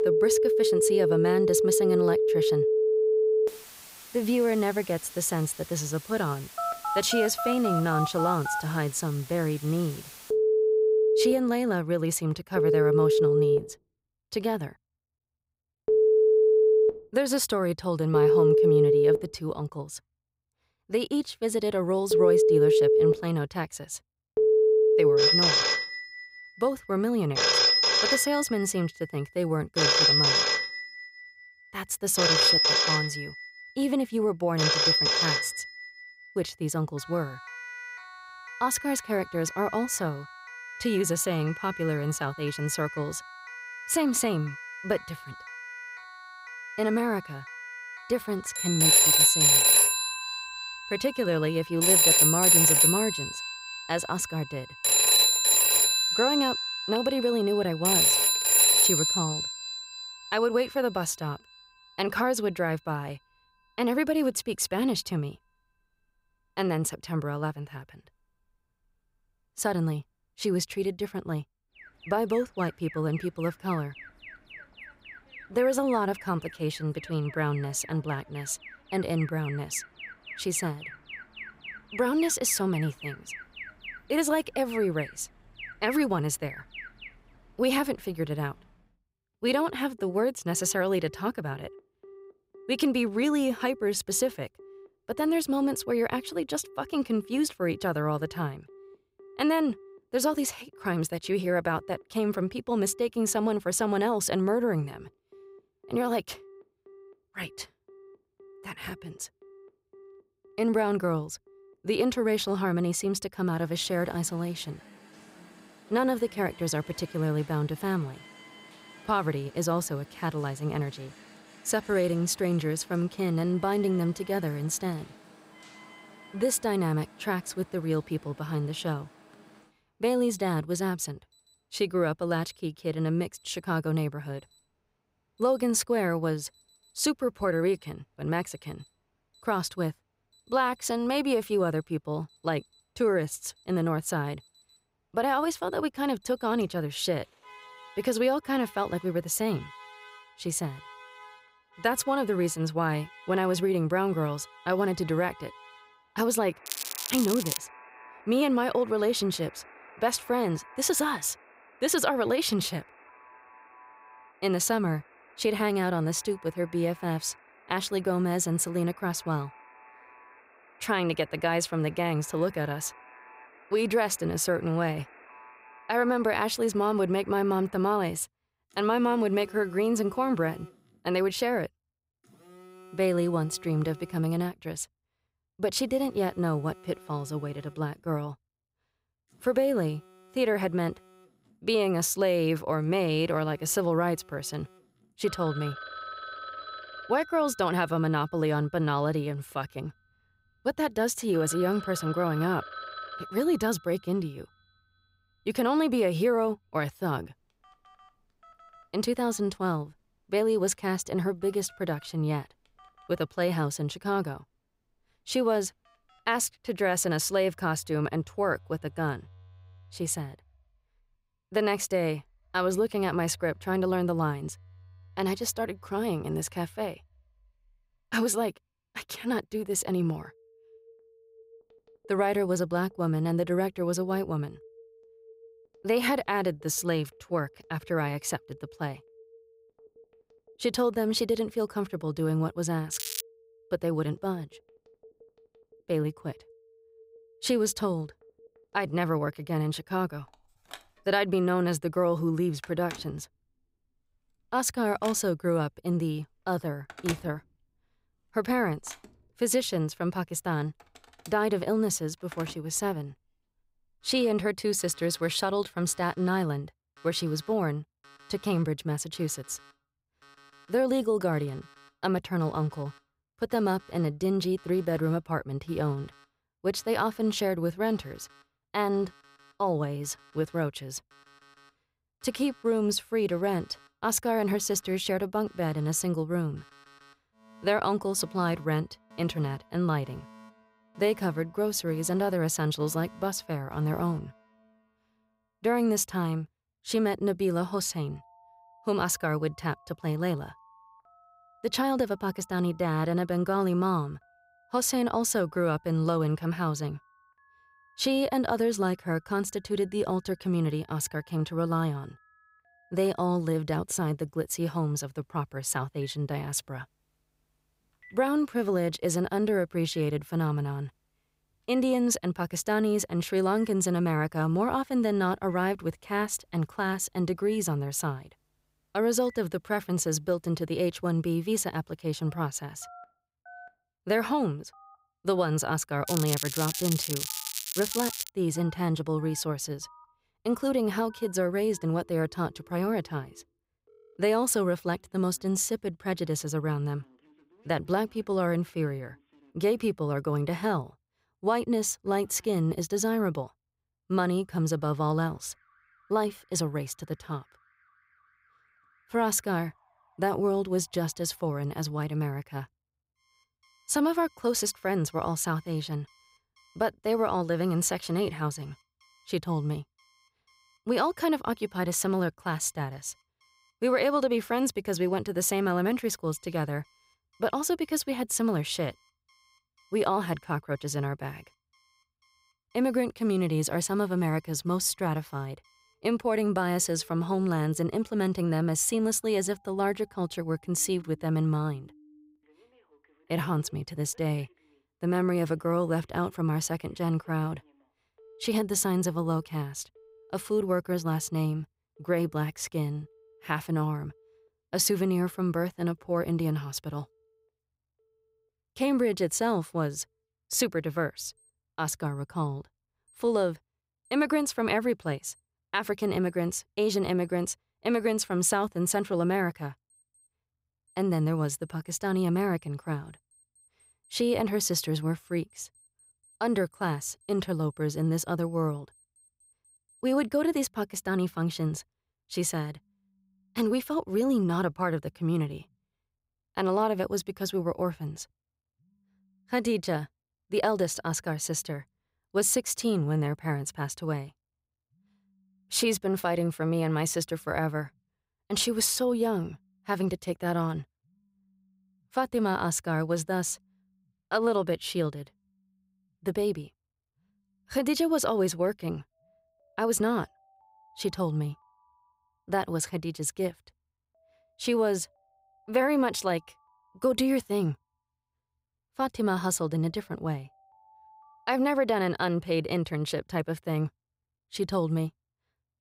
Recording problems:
alarms or sirens; very loud; throughout; 5 dB above the speech
crackling; loud; at 2:37, at 4:03 and from 5:36 to 5:38; 4 dB below the speech

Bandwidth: 15.5 kHz